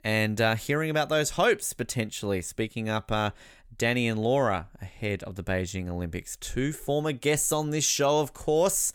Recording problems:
none

